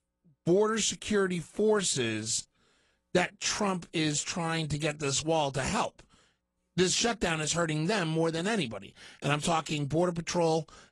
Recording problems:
garbled, watery; slightly

